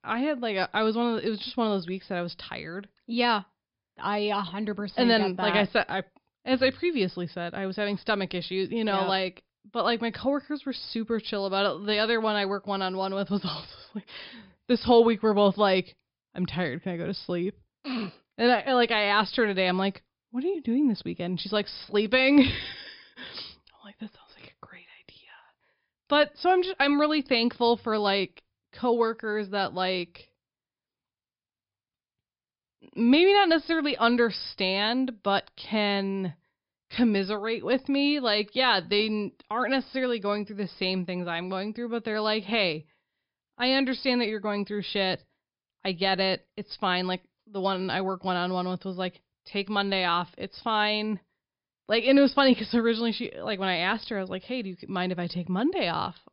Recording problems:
high frequencies cut off; noticeable; nothing above 5.5 kHz

